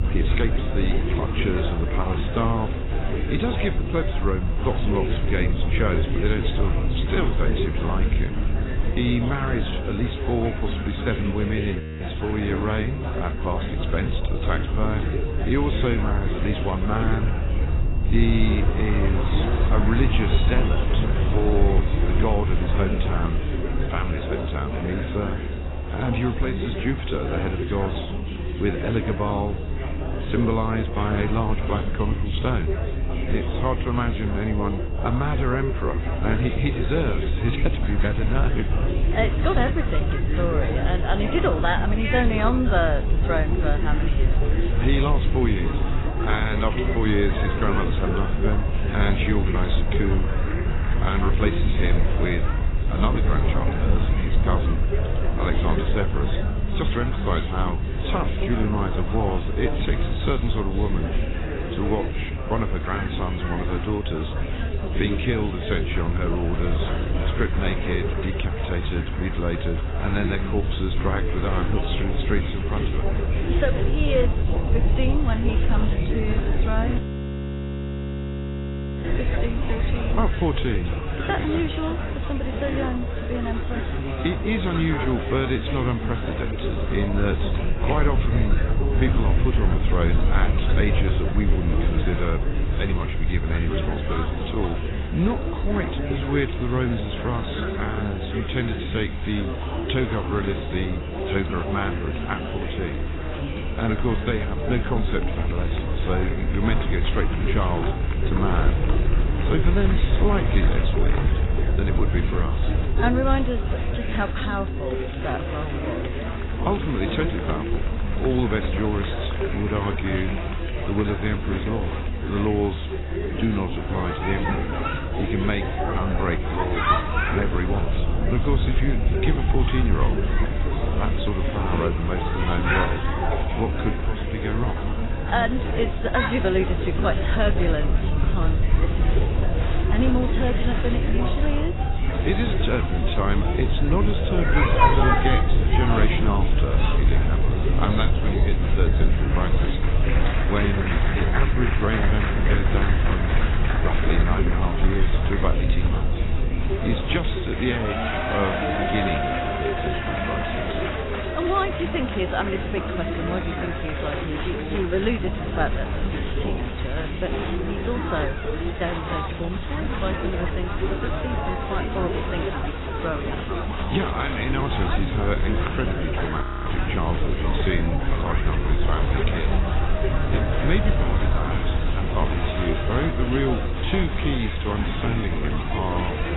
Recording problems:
garbled, watery; badly; nothing above 4 kHz
chatter from many people; loud; throughout; 3 dB below the speech
low rumble; noticeable; throughout; 10 dB below the speech
high-pitched whine; faint; throughout; 2.5 kHz, 20 dB below the speech
audio freezing; at 12 s, at 1:17 for 2 s and at 2:56

